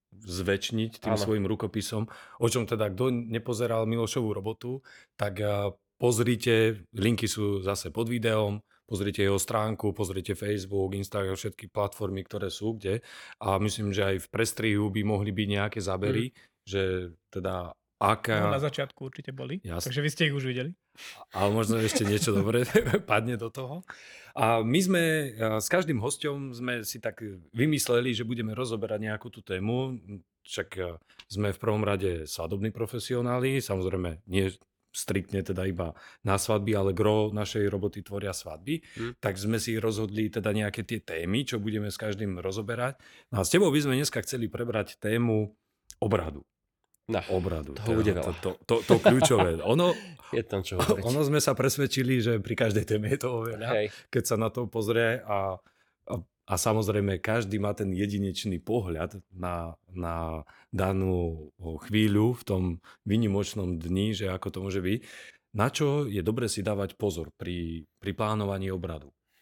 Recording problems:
none

